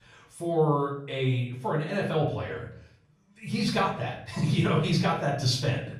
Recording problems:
off-mic speech; far
room echo; noticeable; dies away in 0.5 s

